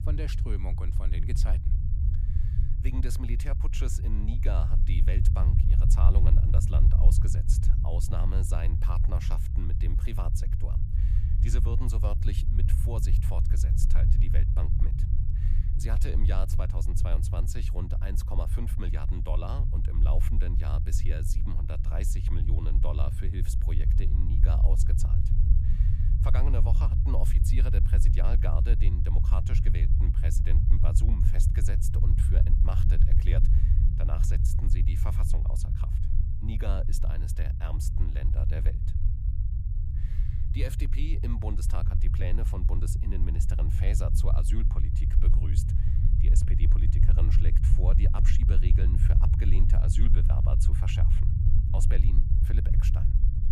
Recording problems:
low rumble; loud; throughout; 1 dB below the speech

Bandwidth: 14.5 kHz